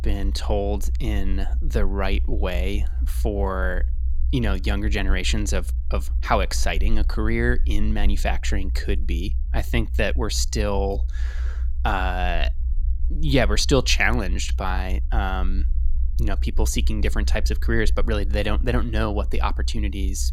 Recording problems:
low rumble; faint; throughout; 20 dB below the speech

